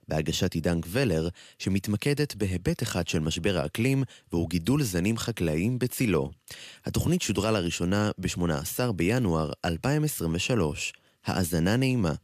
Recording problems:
none

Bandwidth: 14.5 kHz